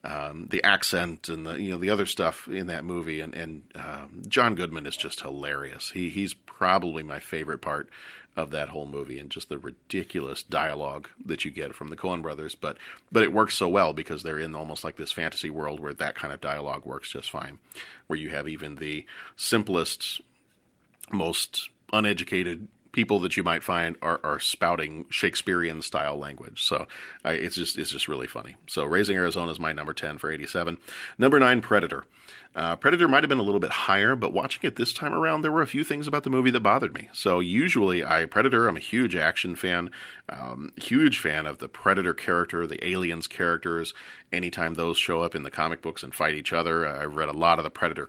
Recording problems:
garbled, watery; slightly; nothing above 15.5 kHz

